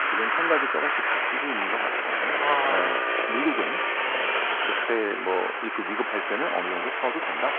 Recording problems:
phone-call audio
traffic noise; very loud; throughout; 5 dB above the speech

